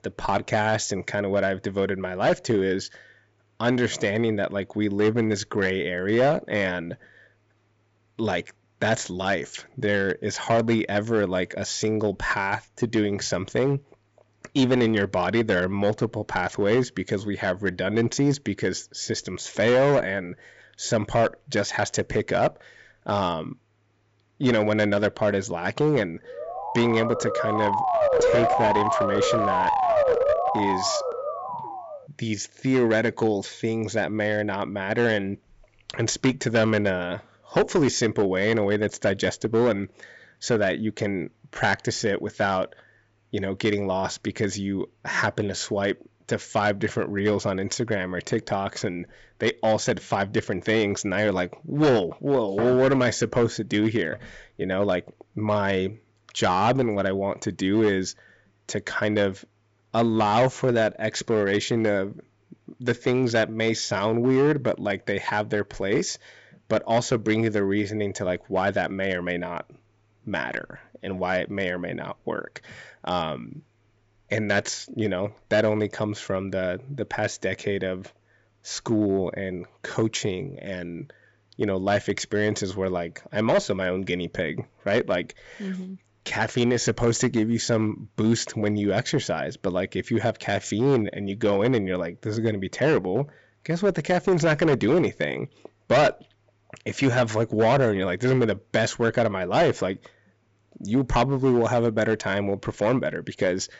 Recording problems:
high frequencies cut off; noticeable; nothing above 8 kHz
distortion; slight; 4% of the sound clipped
siren; loud; from 26 to 32 s; peak 5 dB above the speech

